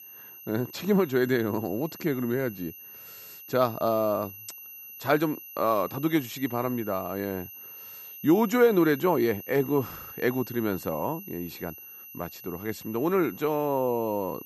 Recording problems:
high-pitched whine; noticeable; throughout; 12 kHz, 15 dB below the speech

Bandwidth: 13.5 kHz